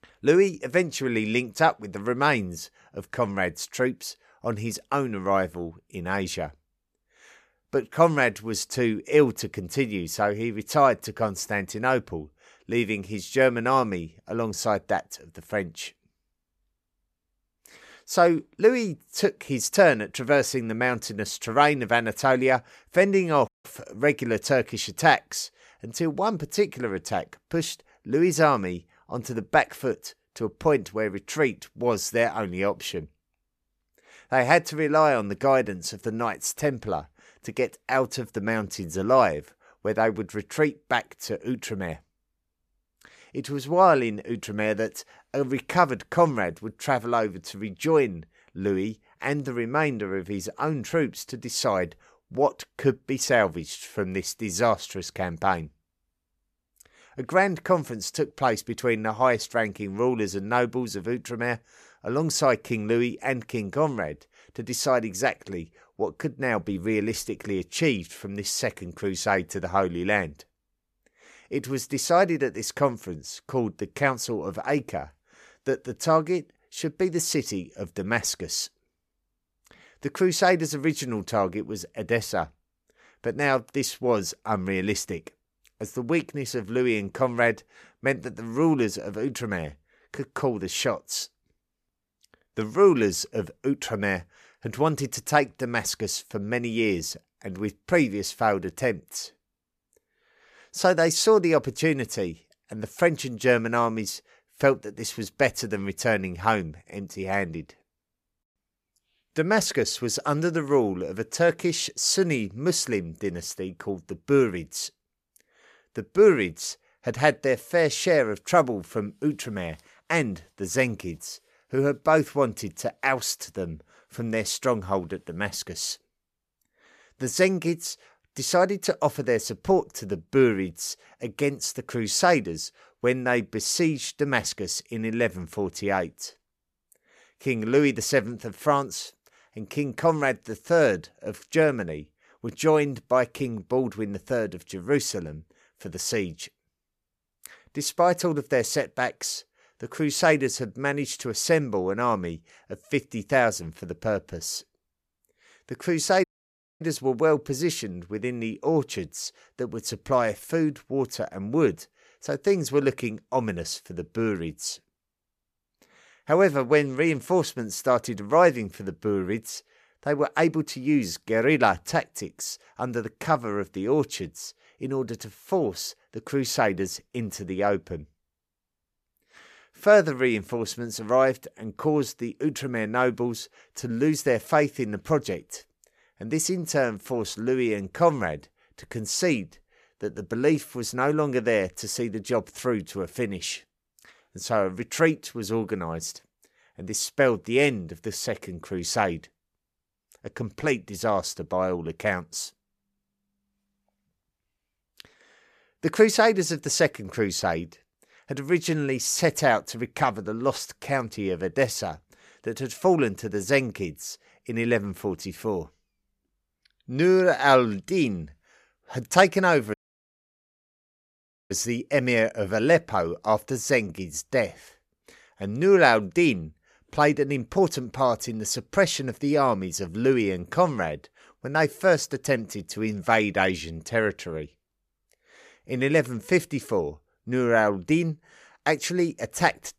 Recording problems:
audio cutting out; at 23 s, at 2:36 for 0.5 s and at 3:40 for 2 s

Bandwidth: 14.5 kHz